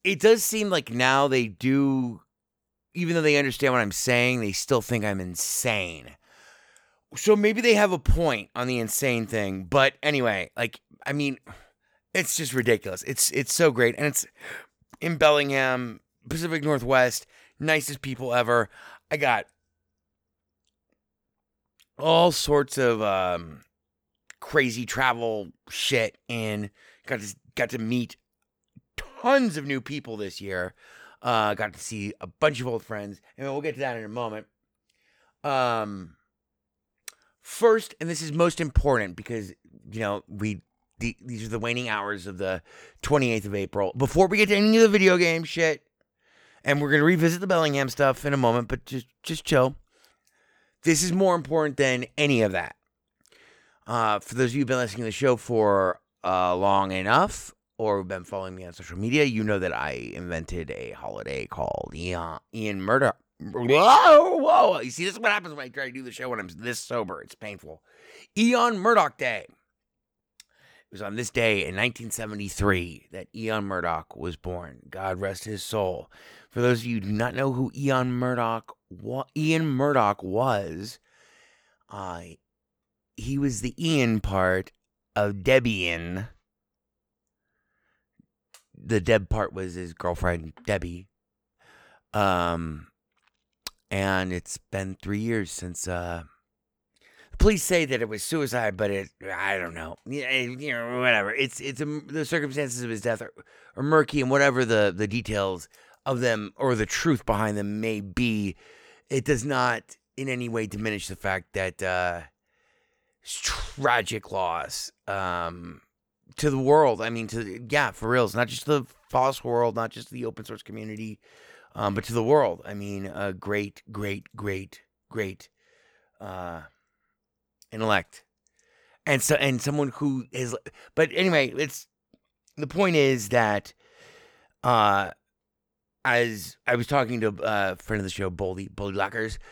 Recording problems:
none

